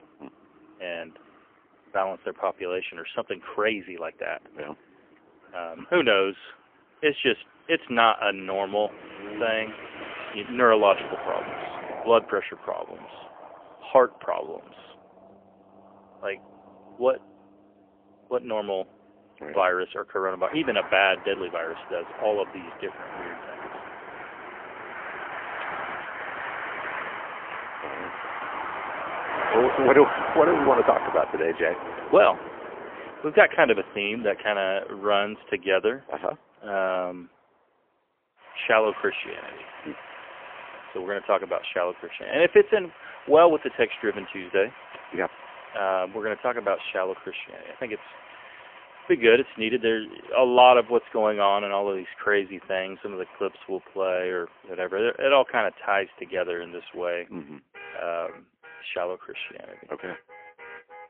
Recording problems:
phone-call audio; poor line; nothing above 3 kHz
traffic noise; noticeable; throughout; 10 dB below the speech

